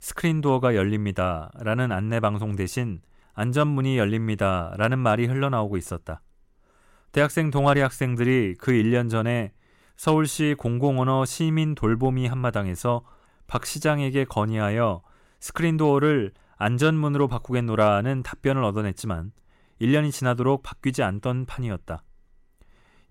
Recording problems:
none

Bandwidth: 16 kHz